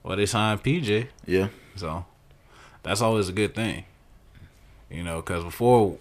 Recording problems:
none

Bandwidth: 14.5 kHz